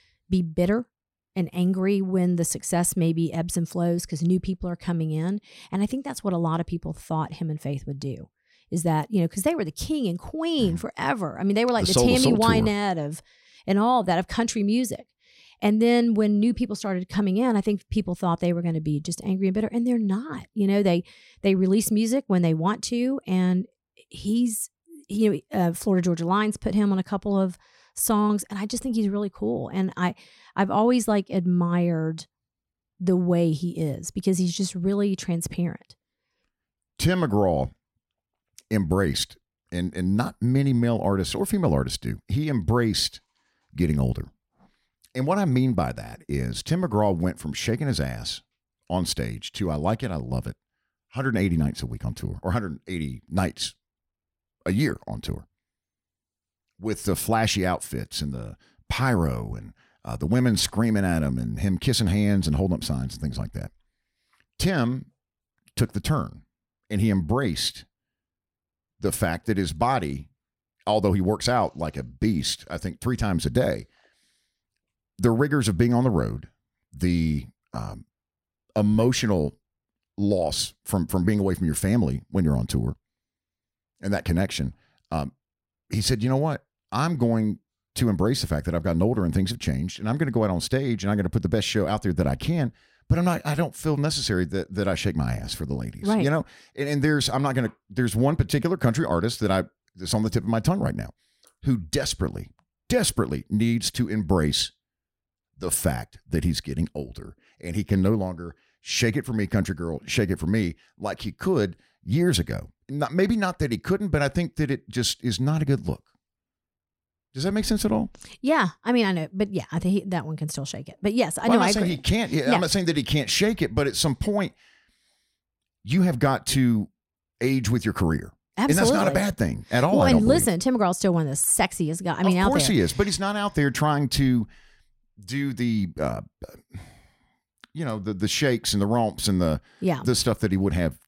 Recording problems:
none

